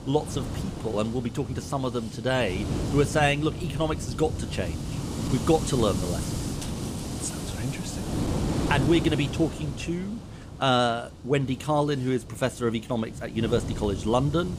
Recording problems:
wind noise on the microphone; heavy; 9 dB below the speech

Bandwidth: 15 kHz